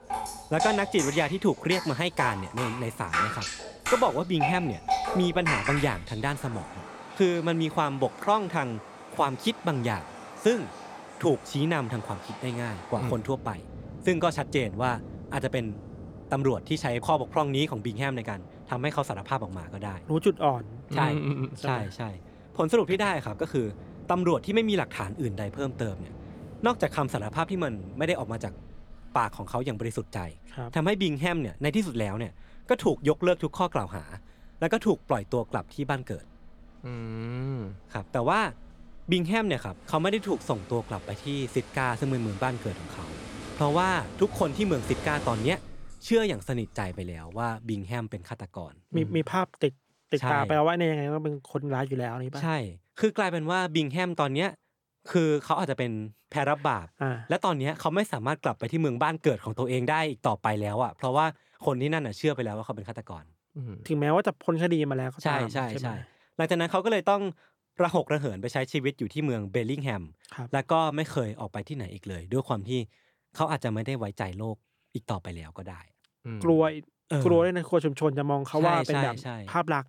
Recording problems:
rain or running water; loud; until 47 s; 9 dB below the speech

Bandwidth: 18 kHz